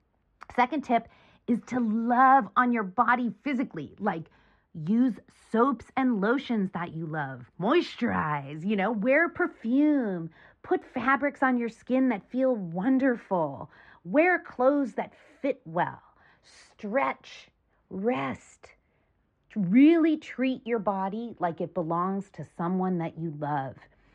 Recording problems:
muffled; very; fading above 1.5 kHz

